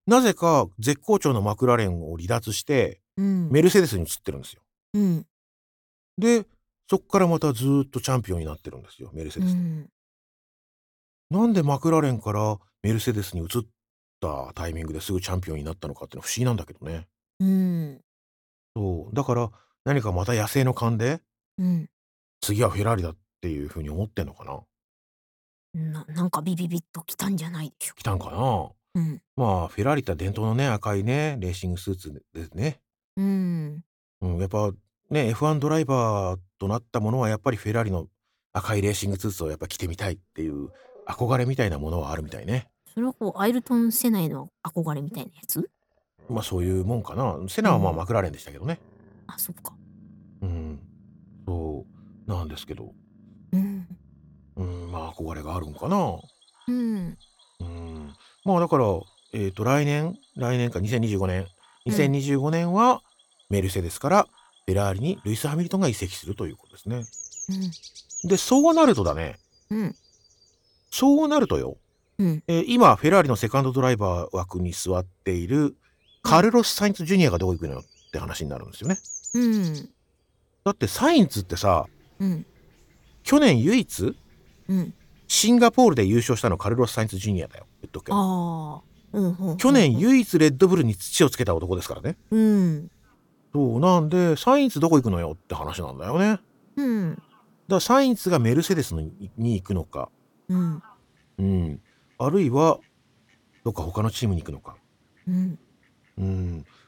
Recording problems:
animal sounds; faint; from 40 s on; 20 dB below the speech

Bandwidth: 17.5 kHz